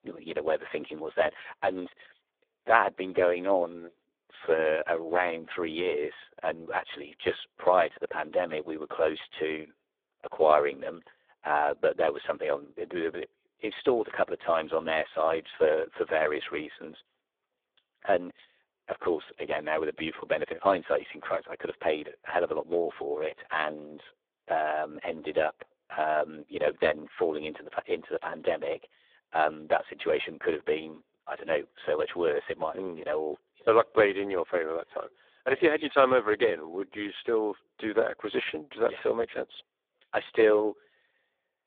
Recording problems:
phone-call audio; poor line

